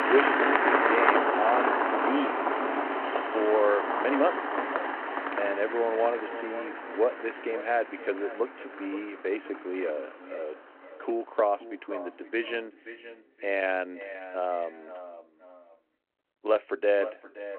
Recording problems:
echo of what is said; noticeable; throughout; 520 ms later, 15 dB below the speech
phone-call audio
traffic noise; very loud; throughout; 3 dB above the speech

